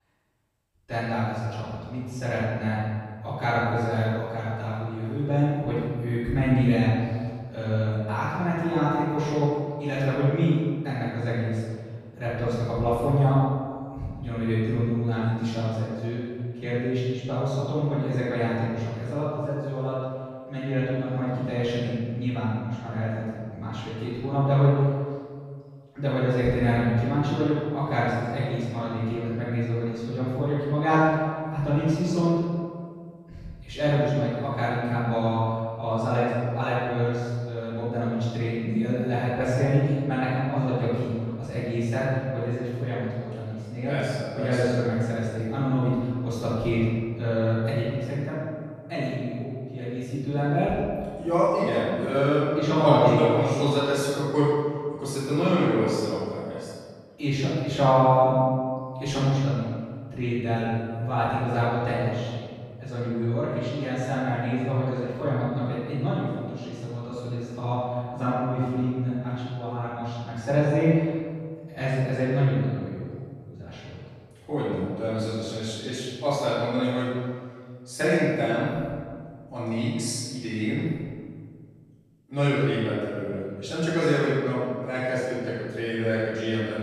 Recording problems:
room echo; strong; dies away in 1.8 s
off-mic speech; far

